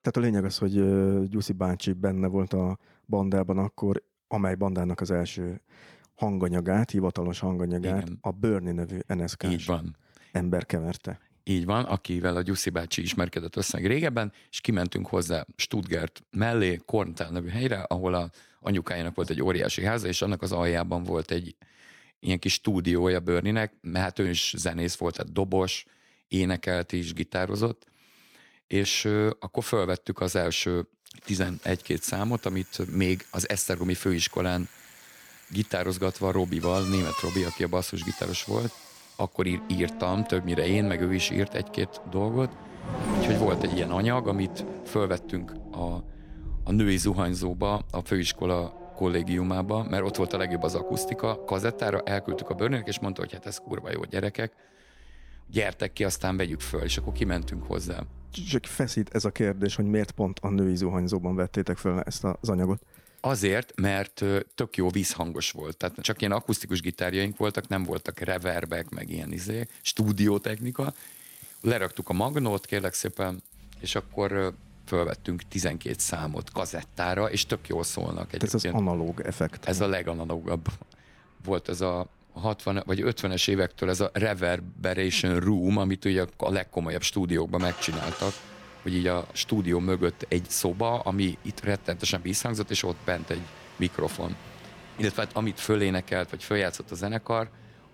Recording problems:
traffic noise; noticeable; from 31 s on; 10 dB below the speech

